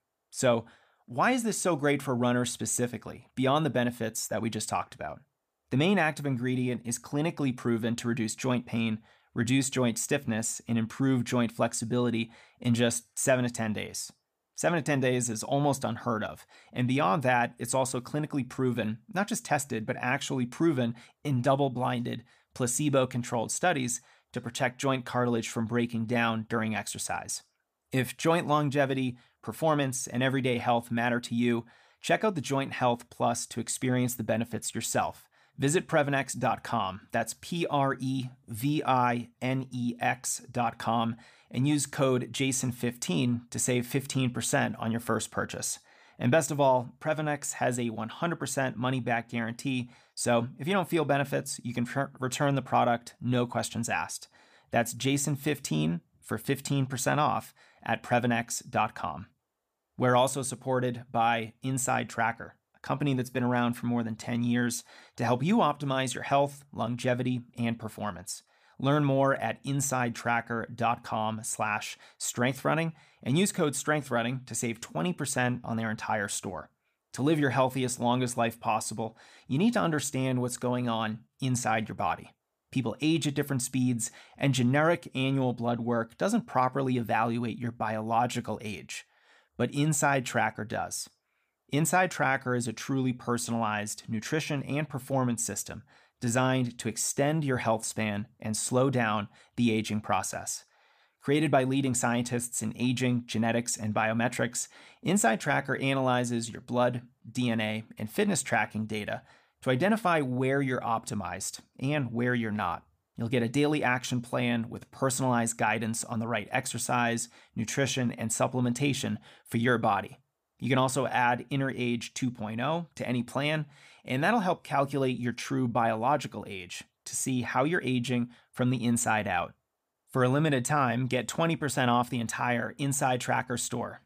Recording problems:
none

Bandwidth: 15 kHz